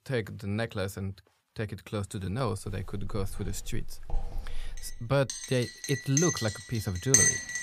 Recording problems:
household noises; very loud; from 3 s on; 4 dB above the speech

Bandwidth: 15 kHz